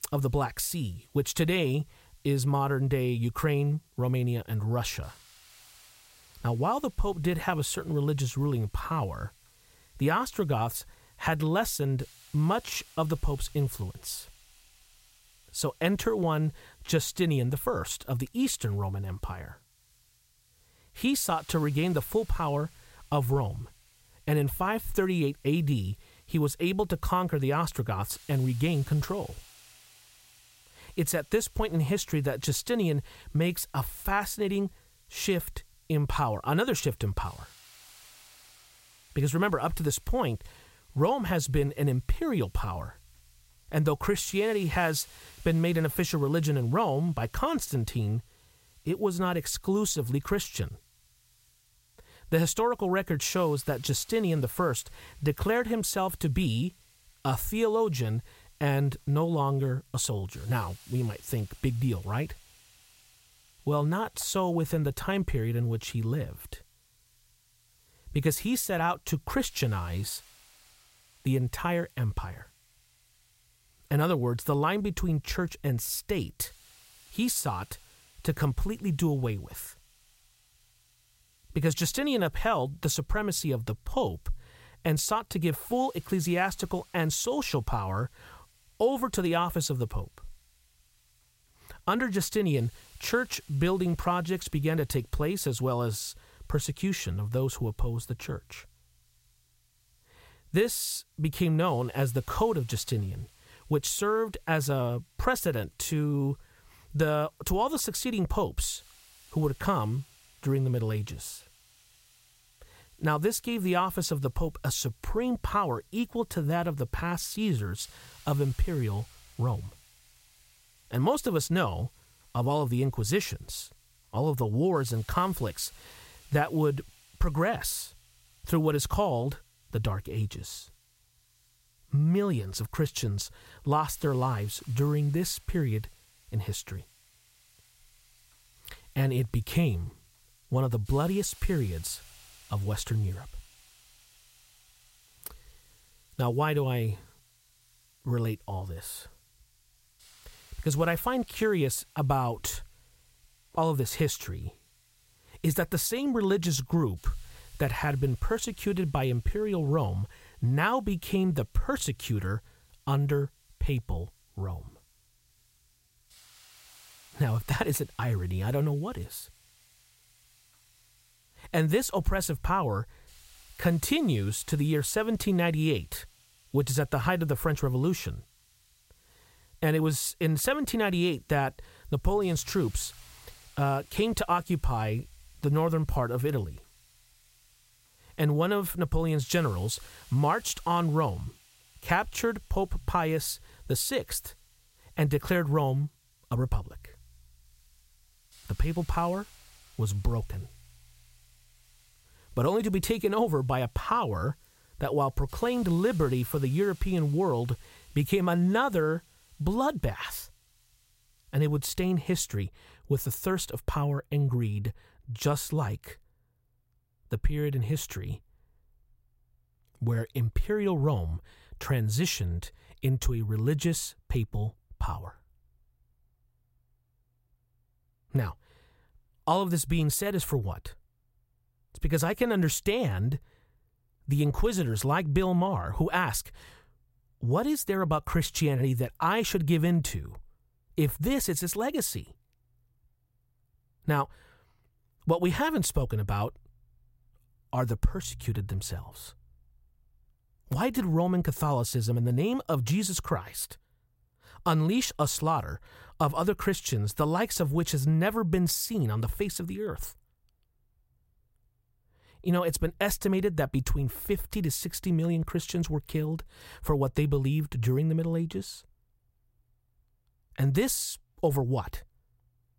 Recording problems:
hiss; faint; until 3:32; 30 dB below the speech

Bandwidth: 16 kHz